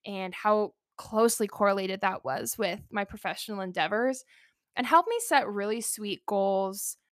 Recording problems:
none

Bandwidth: 14.5 kHz